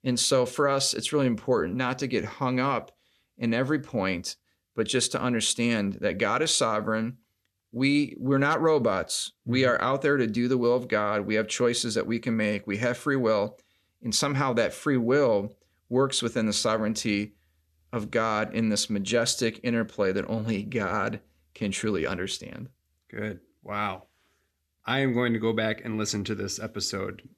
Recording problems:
none

